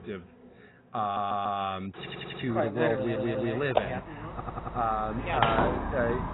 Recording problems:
garbled, watery; badly; nothing above 4 kHz
muffled; very slightly; fading above 3 kHz
household noises; loud; throughout; 2 dB below the speech
audio stuttering; 4 times, first at 1 s

